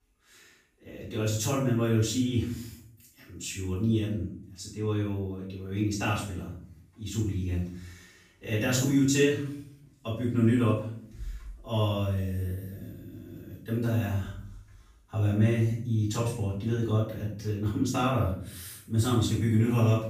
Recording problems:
off-mic speech; far
room echo; noticeable; dies away in 0.6 s

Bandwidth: 15 kHz